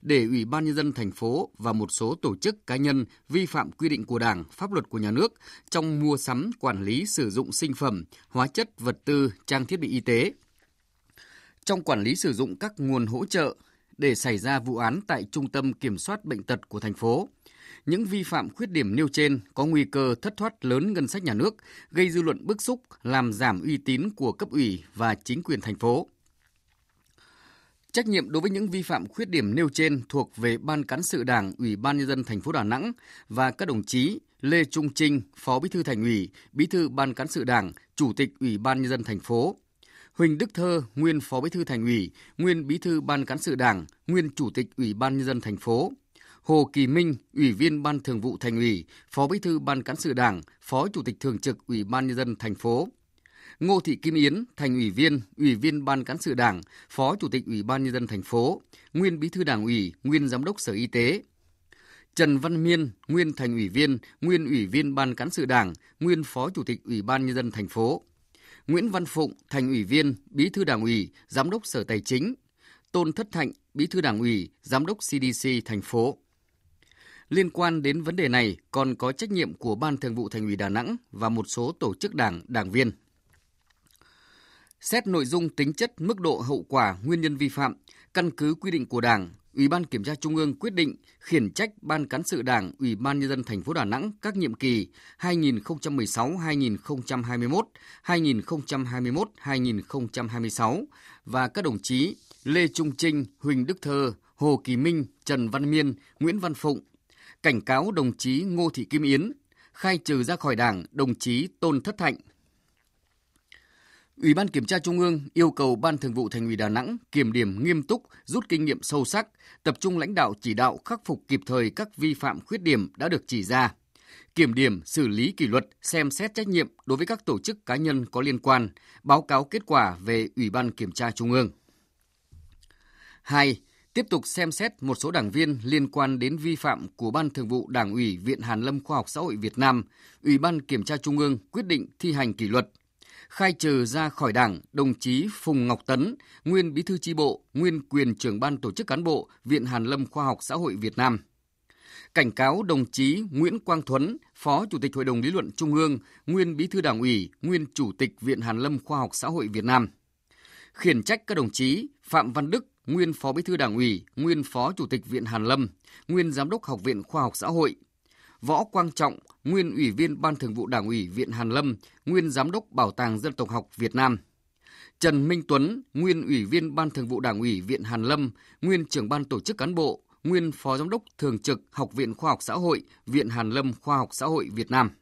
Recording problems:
none

